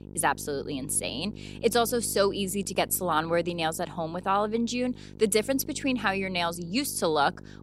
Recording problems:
electrical hum; faint; throughout; 50 Hz, 25 dB below the speech

